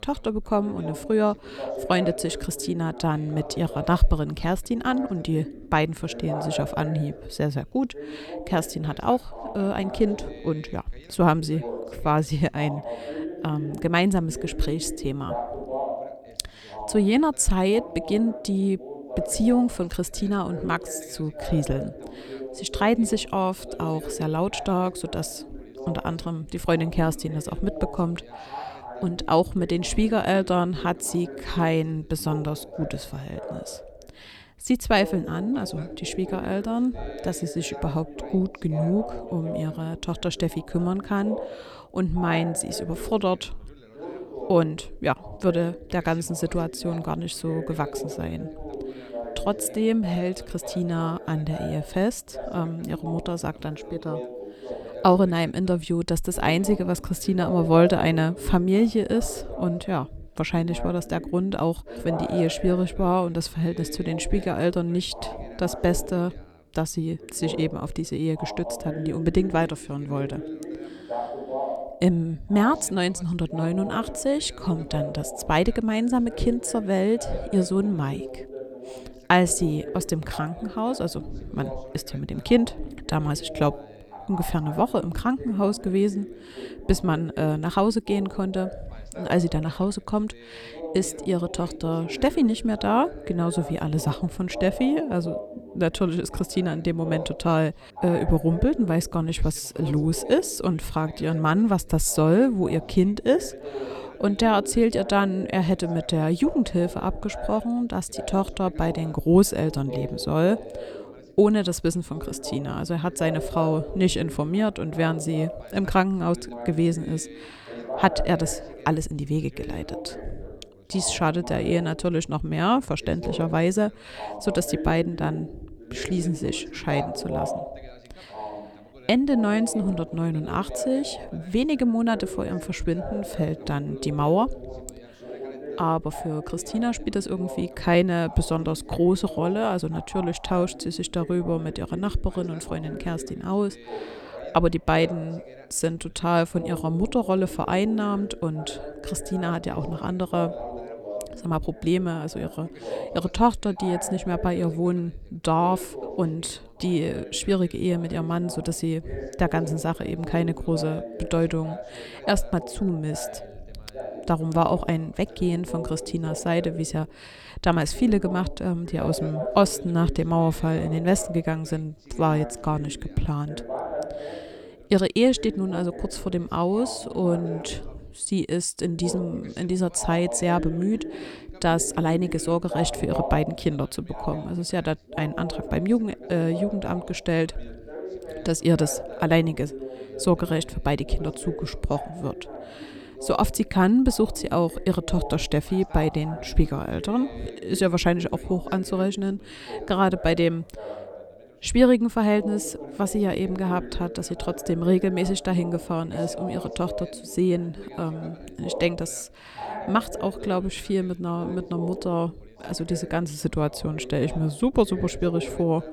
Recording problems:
background chatter; noticeable; throughout; 2 voices, 10 dB below the speech

